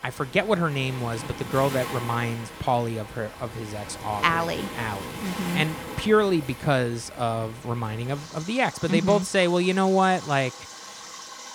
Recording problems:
rain or running water; noticeable; throughout; 10 dB below the speech

